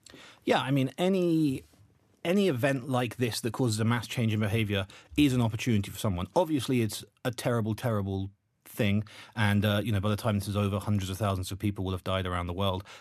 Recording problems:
none

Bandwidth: 14 kHz